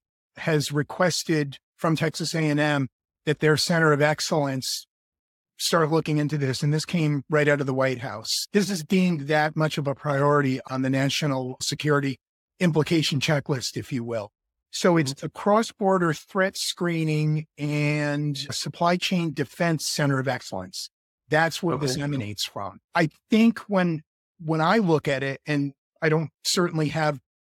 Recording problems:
none

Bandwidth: 17 kHz